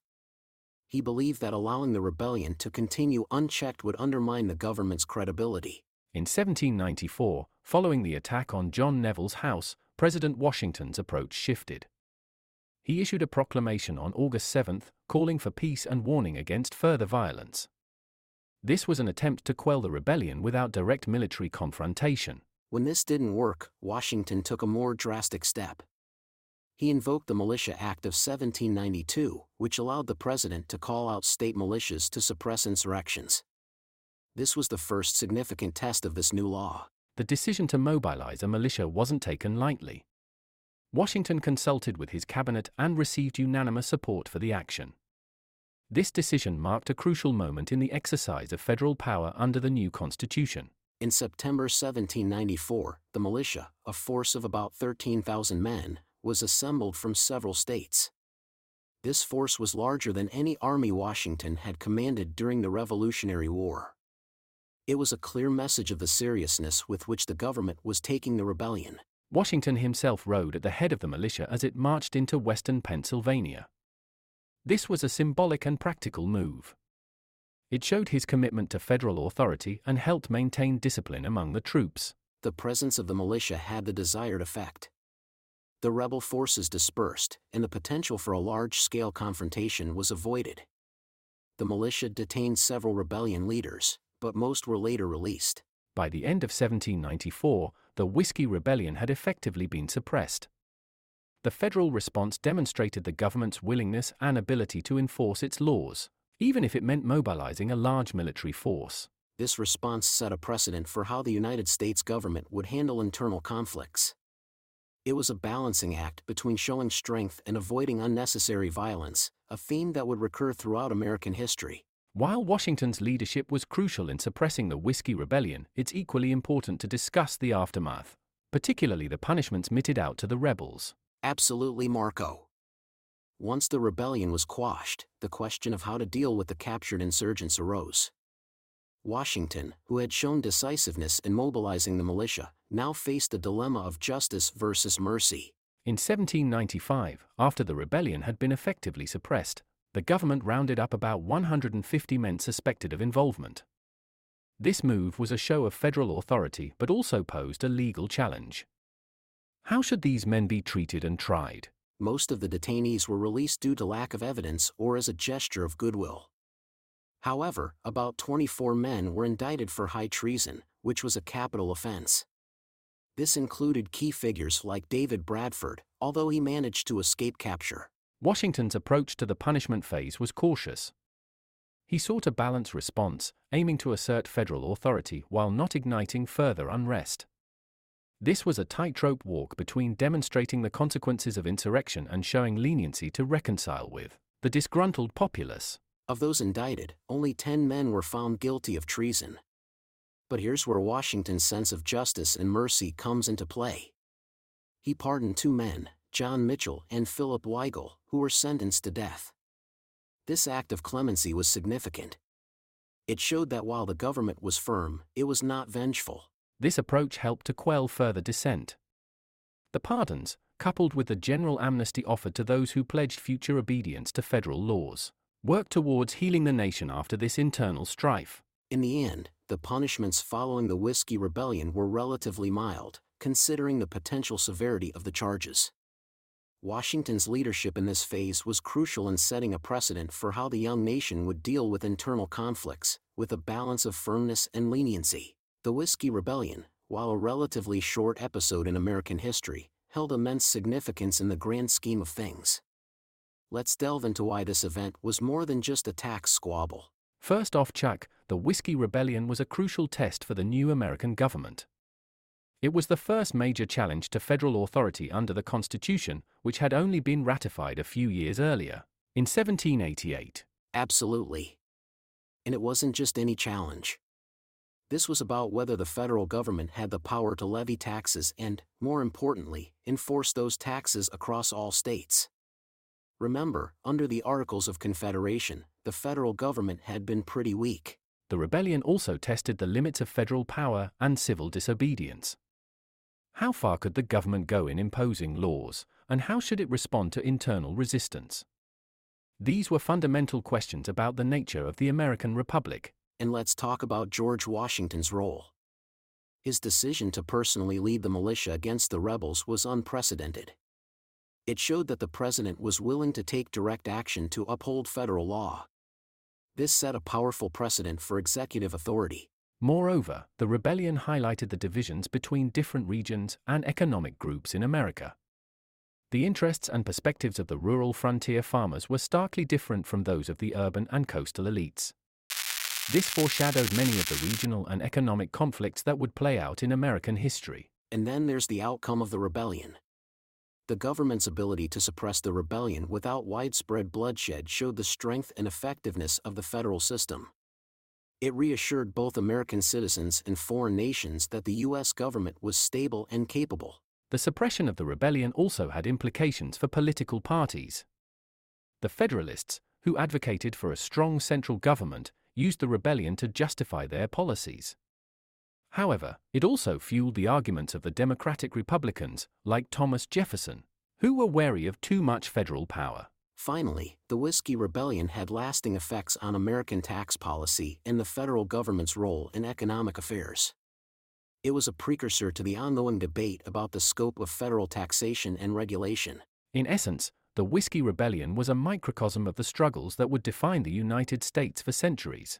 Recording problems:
crackling; loud; from 5:32 to 5:34; 1 dB below the speech

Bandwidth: 16 kHz